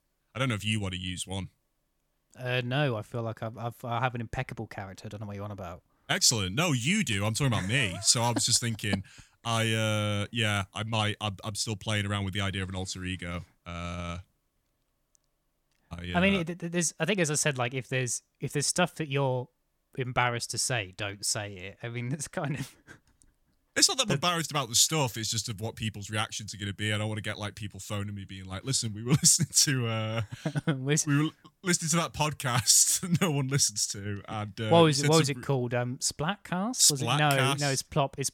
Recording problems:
none

